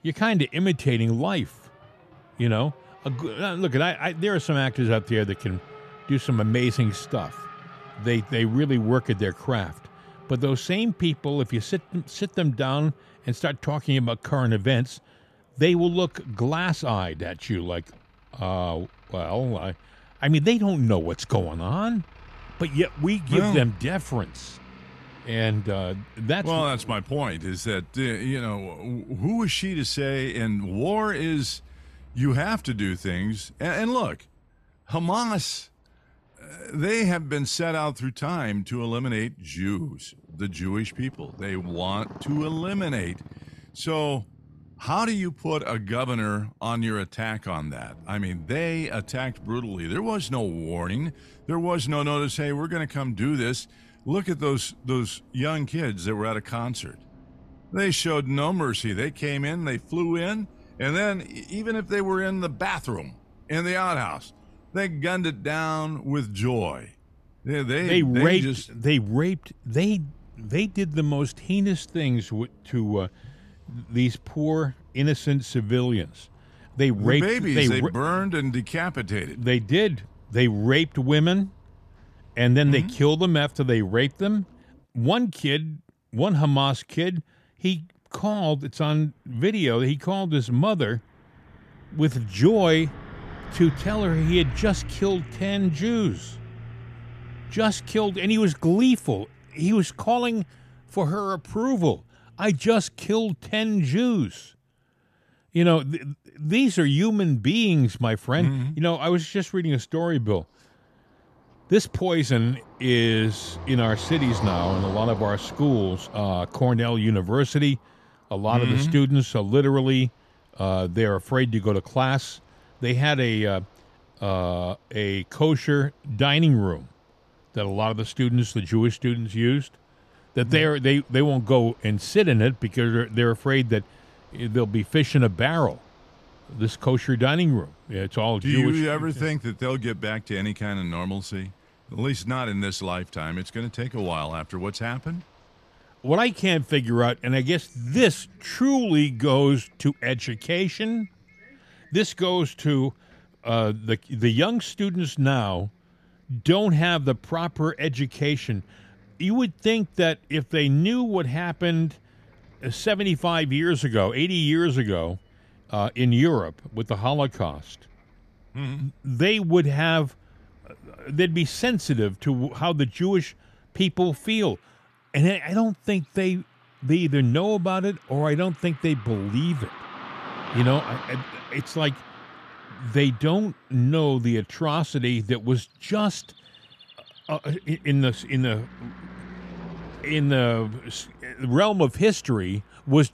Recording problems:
traffic noise; faint; throughout; 20 dB below the speech

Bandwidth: 14.5 kHz